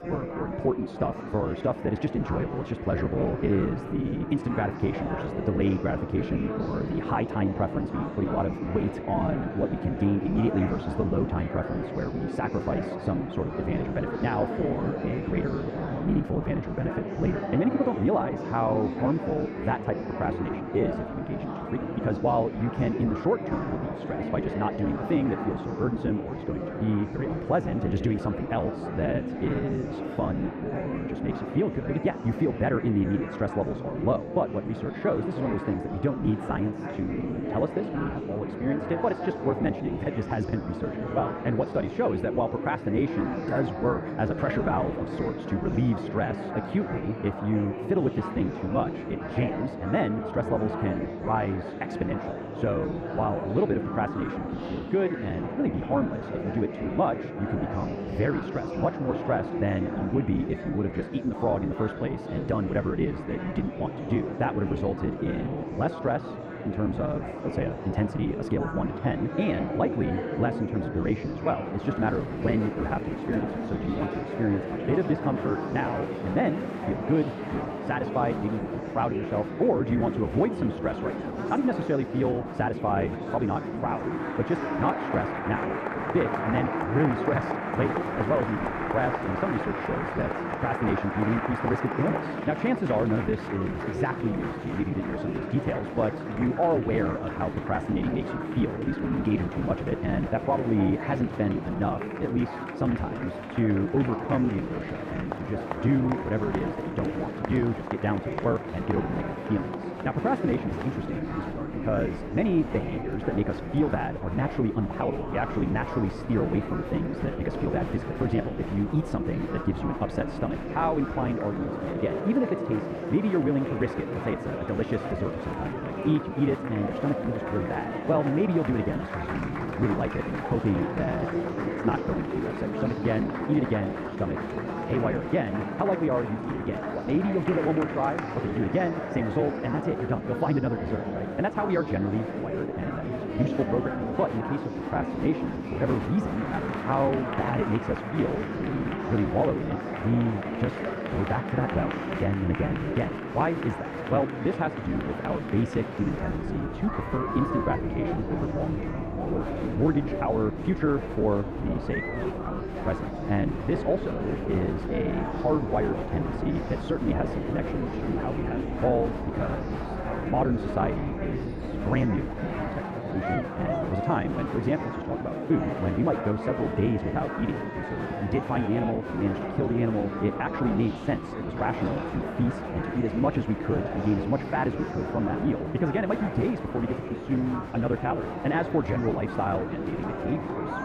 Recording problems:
muffled; very; fading above 3 kHz
wrong speed, natural pitch; too fast; 1.6 times normal speed
murmuring crowd; loud; throughout; 4 dB below the speech

